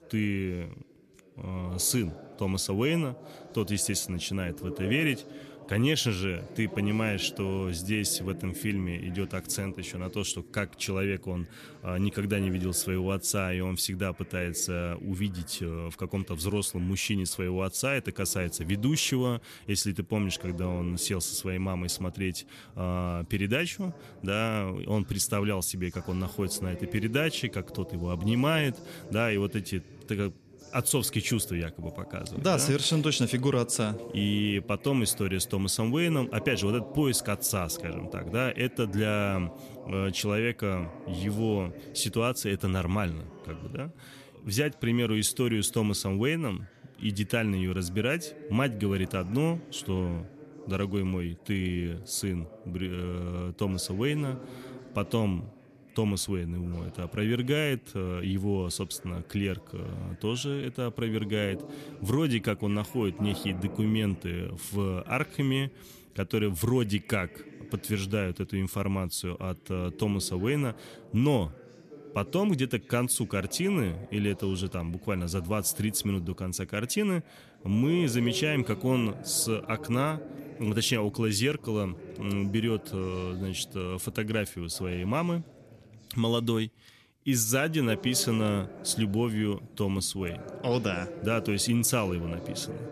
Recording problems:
background chatter; noticeable; throughout; 2 voices, 15 dB below the speech

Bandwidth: 14 kHz